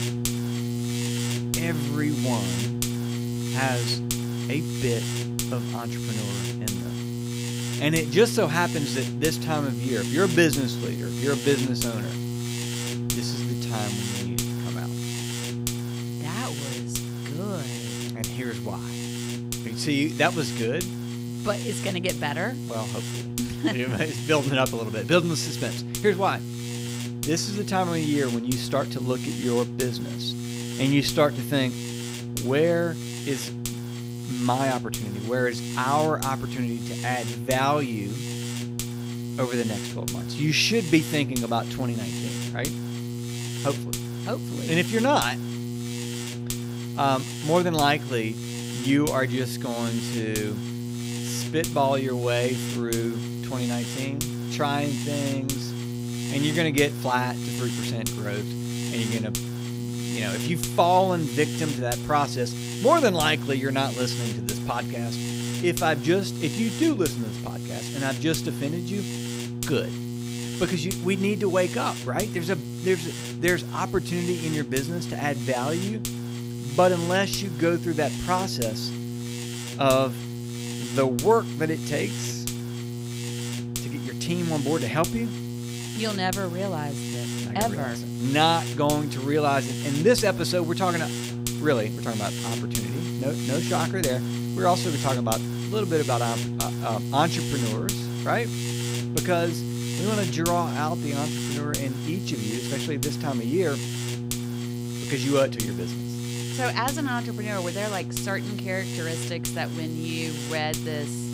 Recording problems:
electrical hum; loud; throughout; 60 Hz, 8 dB below the speech

